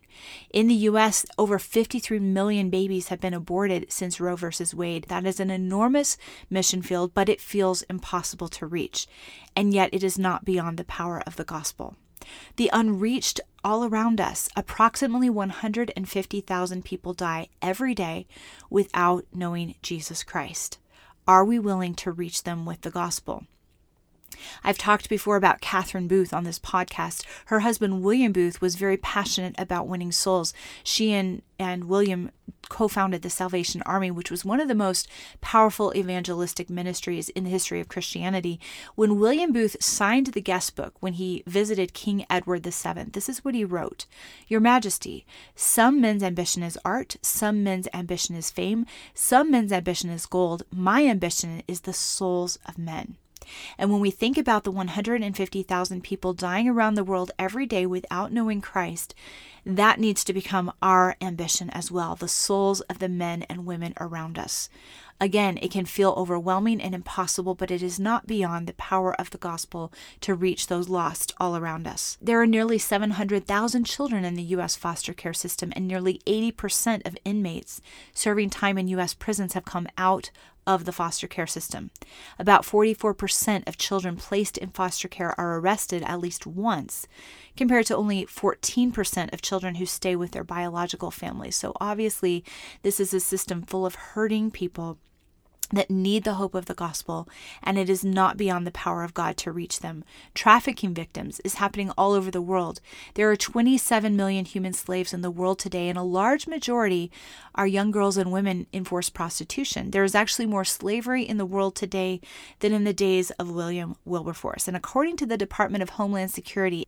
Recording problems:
none

